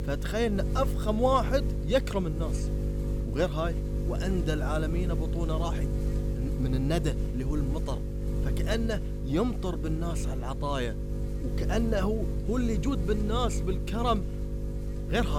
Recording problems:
electrical hum; loud; throughout; 50 Hz, 9 dB below the speech
abrupt cut into speech; at the end

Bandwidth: 17 kHz